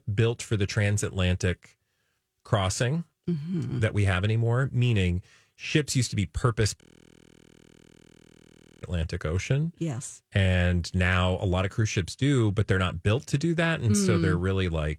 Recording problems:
audio freezing; at 7 s for 2 s

